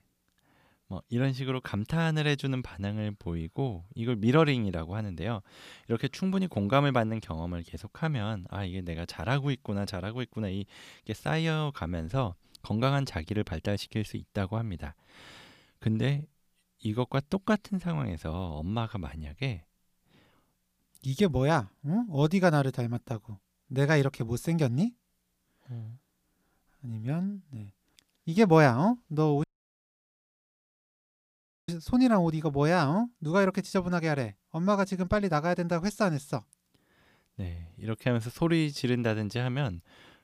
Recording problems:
audio cutting out; at 29 s for 2 s

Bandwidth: 15 kHz